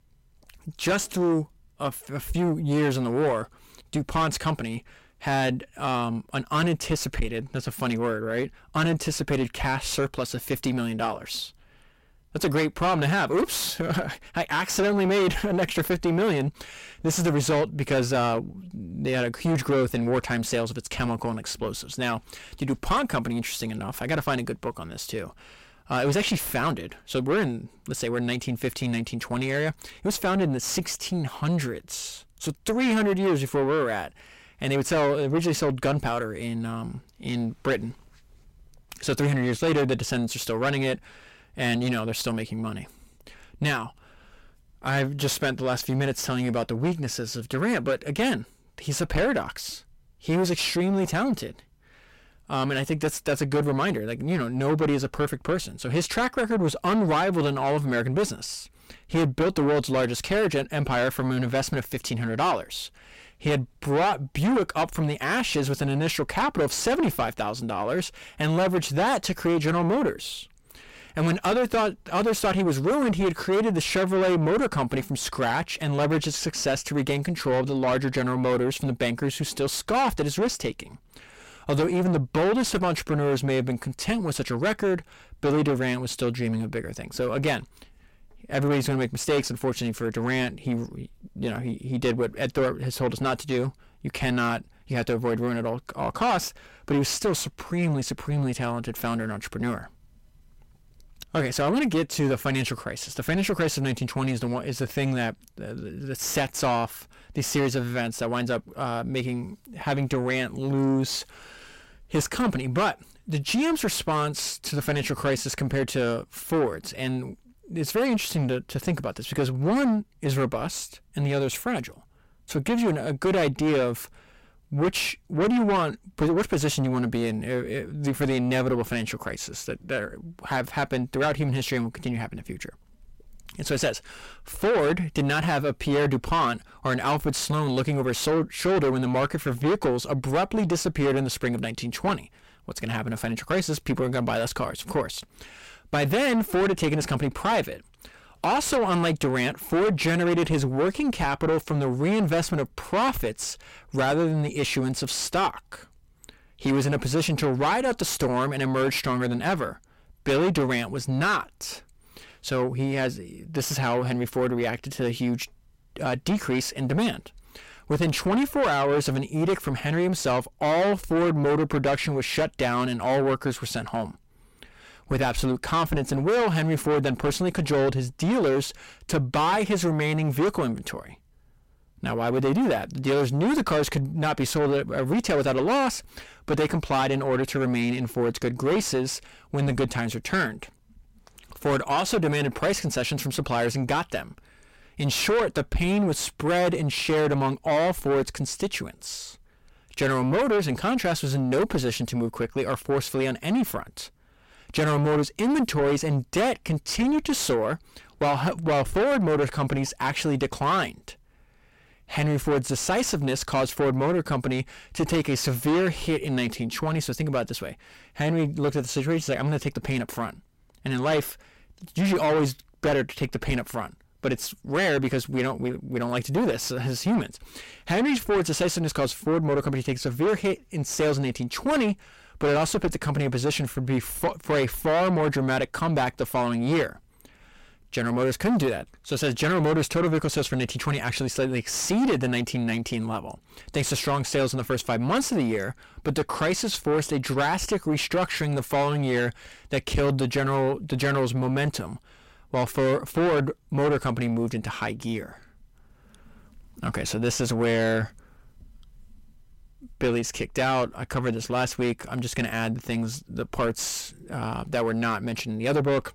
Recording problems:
distortion; heavy; 6 dB below the speech

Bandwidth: 16 kHz